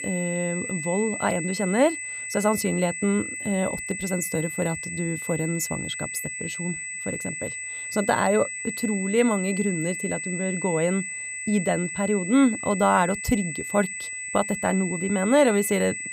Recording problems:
high-pitched whine; loud; throughout; 2 kHz, 5 dB below the speech

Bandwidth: 15.5 kHz